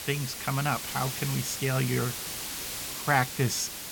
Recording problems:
hiss; loud; throughout; 5 dB below the speech

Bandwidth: 17 kHz